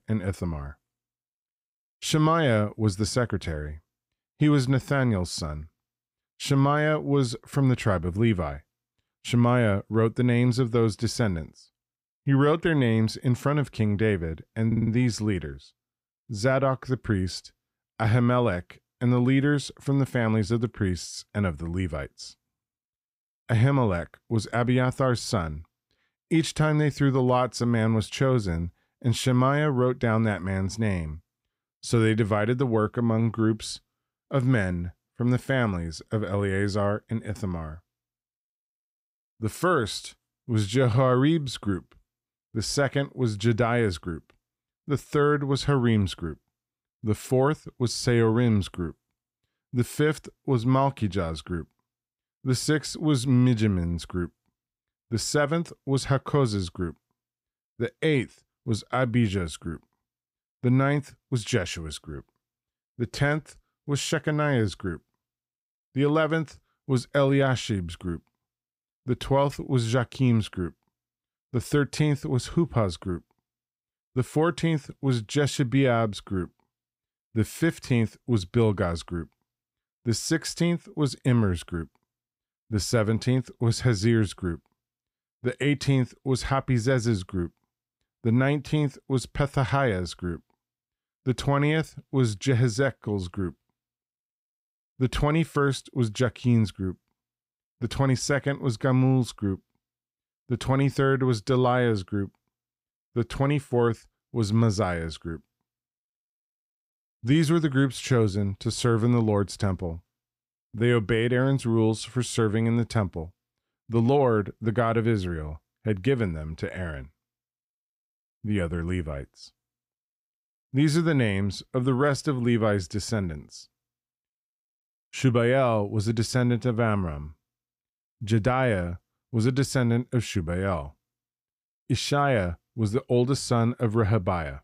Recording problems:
audio stuttering; at 15 s

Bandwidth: 15.5 kHz